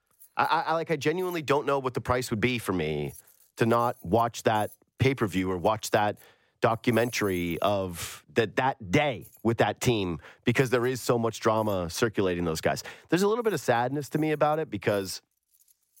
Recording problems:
household noises; faint; throughout; 25 dB below the speech

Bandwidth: 16 kHz